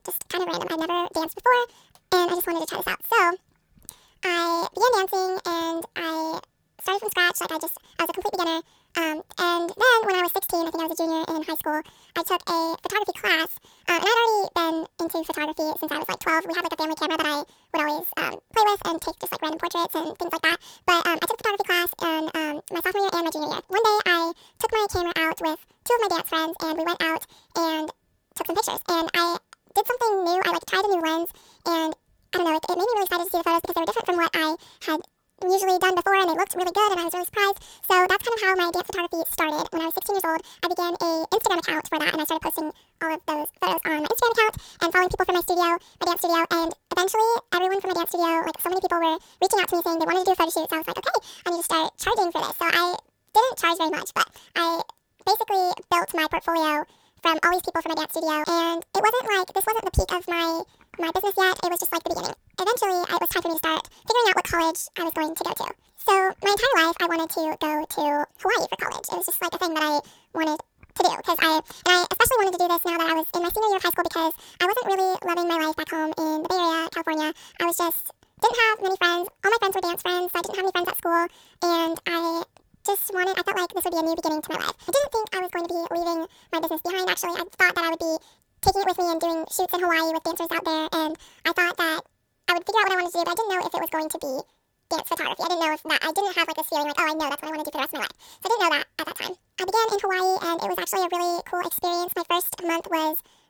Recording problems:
wrong speed and pitch; too fast and too high; 1.7 times normal speed

